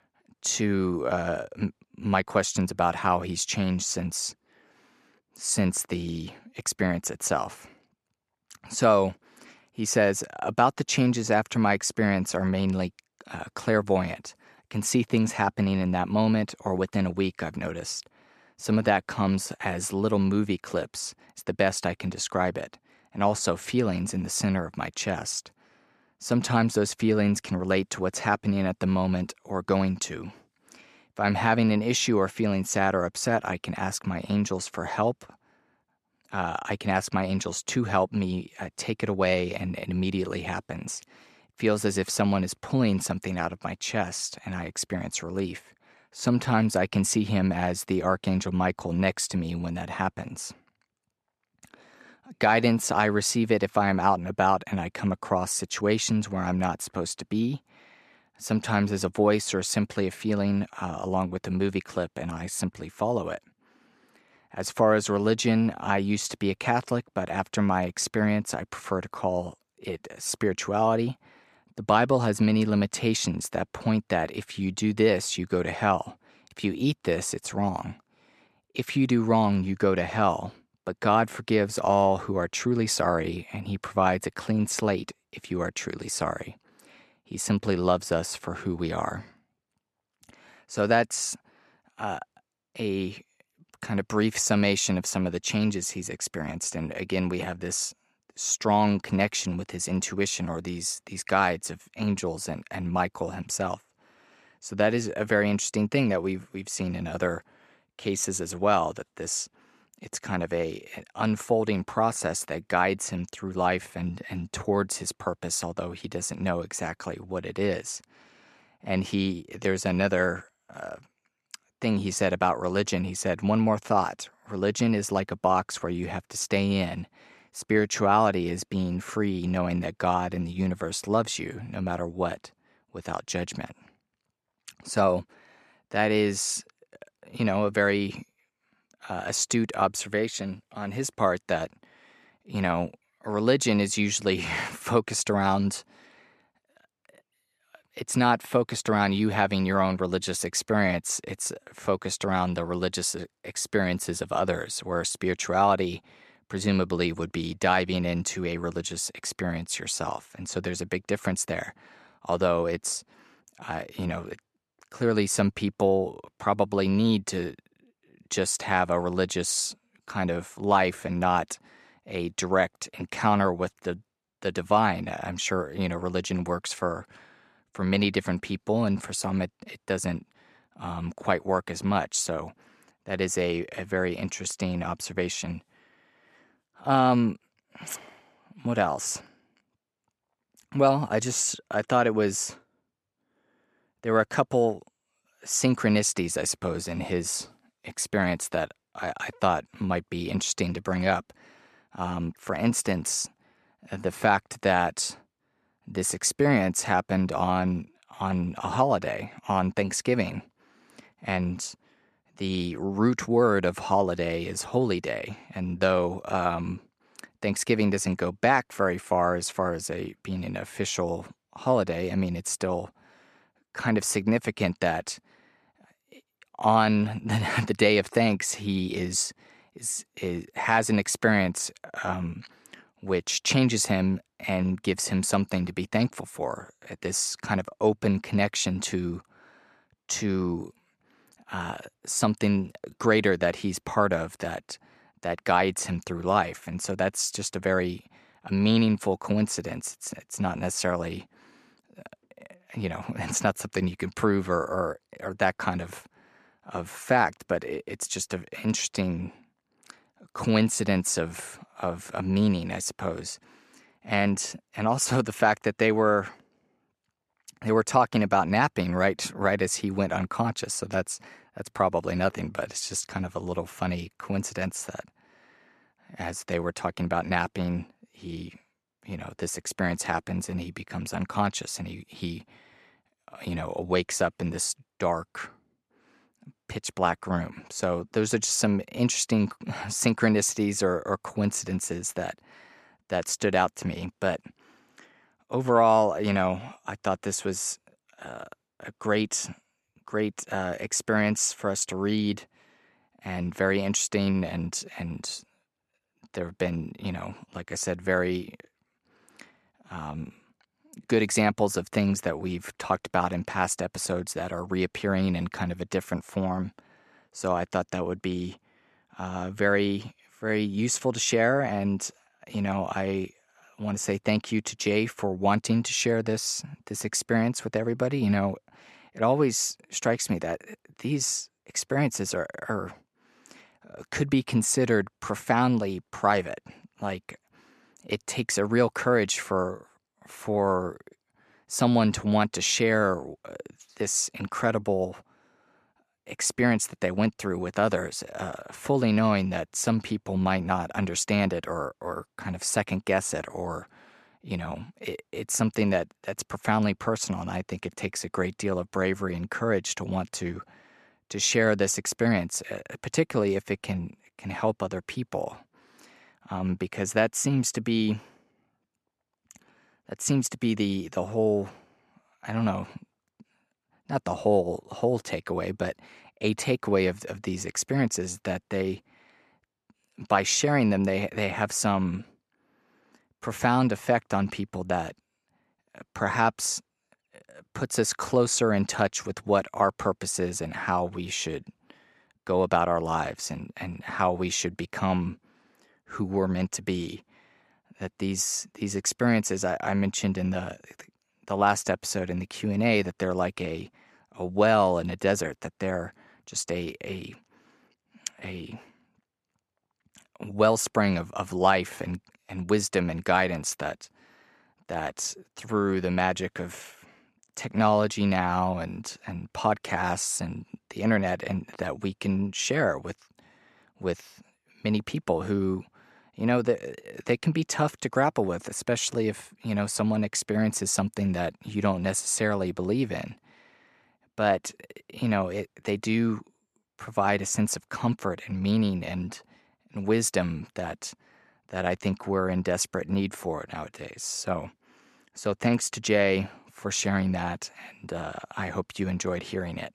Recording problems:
none

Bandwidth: 13.5 kHz